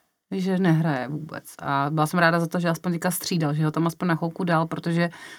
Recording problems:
none

